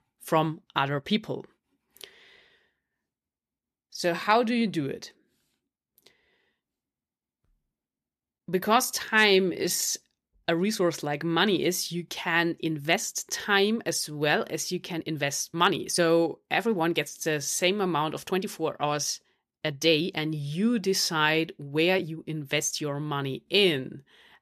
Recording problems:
uneven, jittery; strongly; from 0.5 to 24 s

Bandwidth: 14.5 kHz